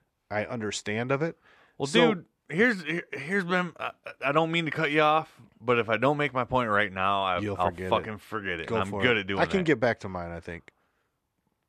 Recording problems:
none

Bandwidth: 13.5 kHz